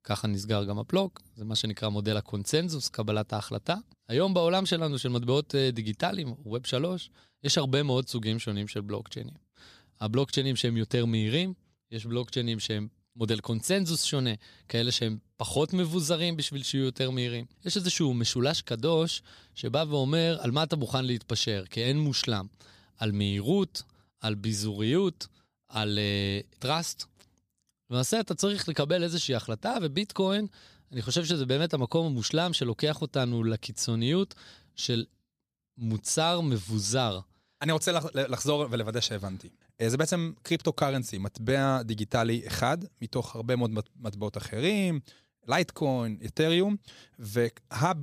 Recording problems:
abrupt cut into speech; at the end

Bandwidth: 15 kHz